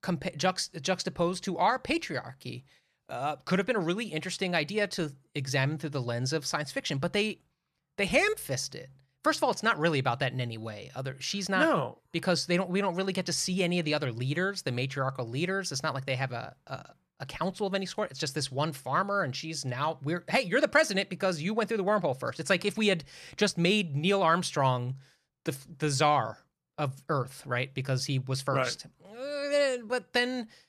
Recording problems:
none

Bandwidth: 14.5 kHz